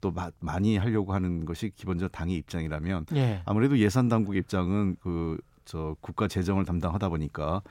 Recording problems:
none

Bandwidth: 16 kHz